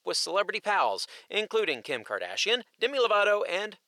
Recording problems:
thin; somewhat; fading below 450 Hz

